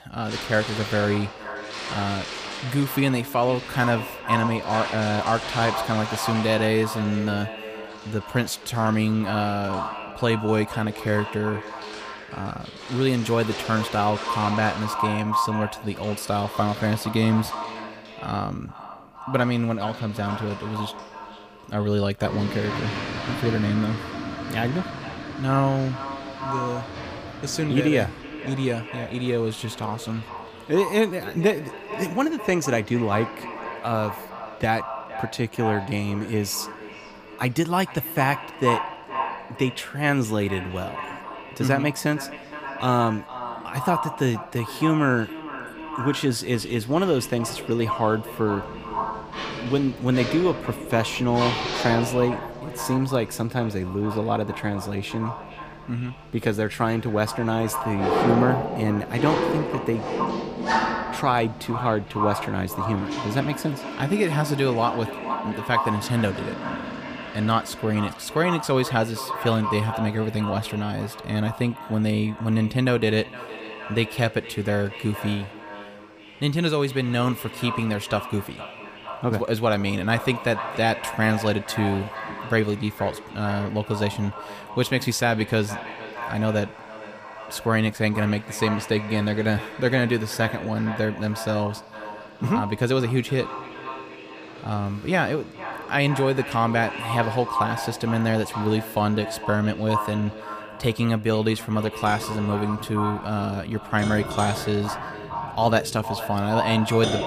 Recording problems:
echo of what is said; strong; throughout; 460 ms later, 9 dB below the speech
household noises; loud; throughout; 9 dB below the speech

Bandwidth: 15 kHz